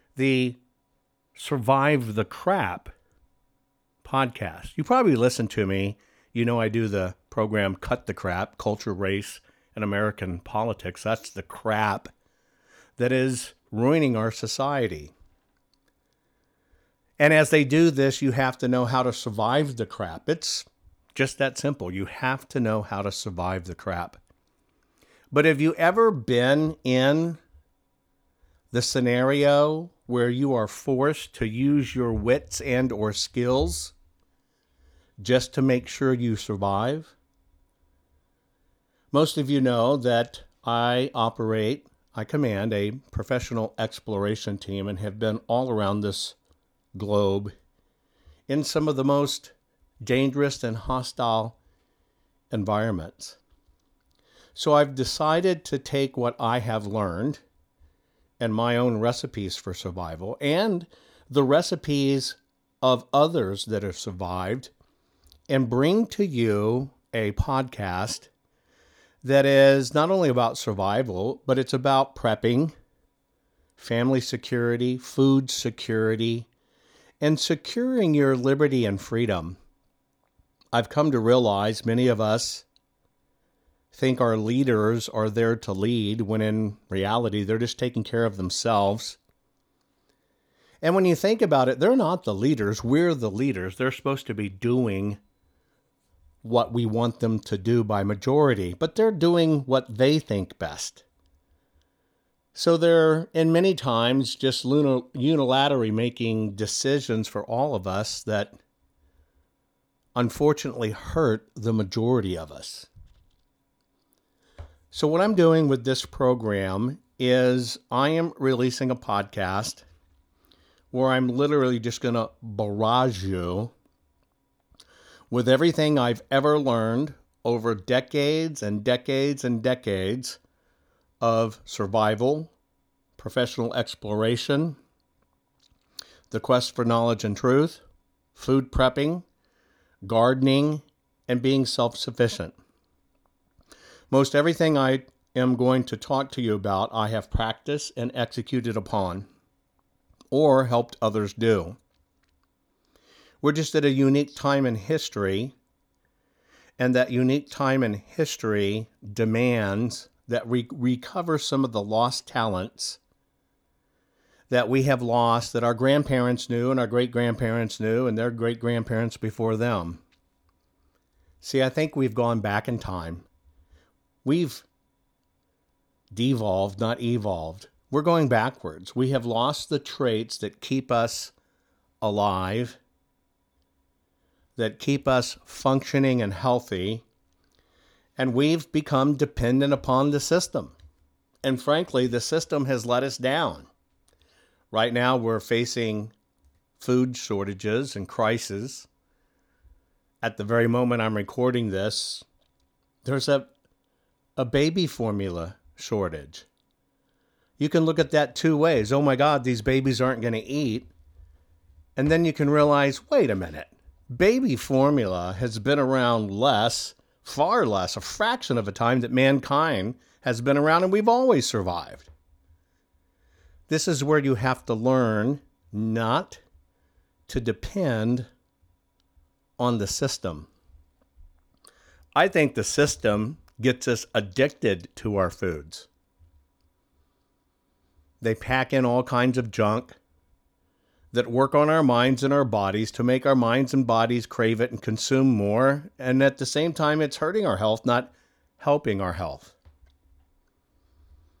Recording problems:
none

